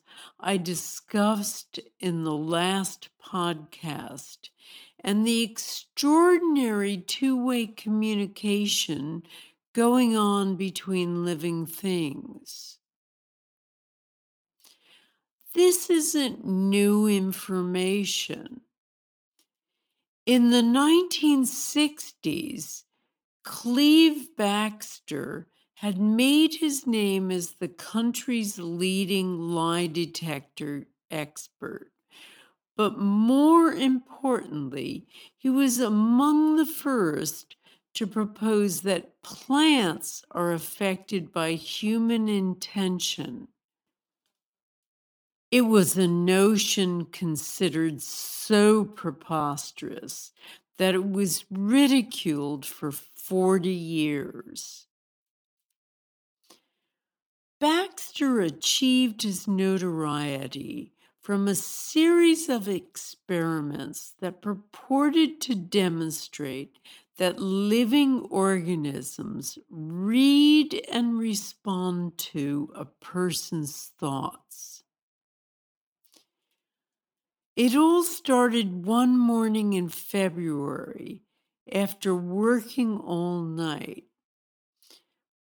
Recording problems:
wrong speed, natural pitch; too slow; 0.6 times normal speed

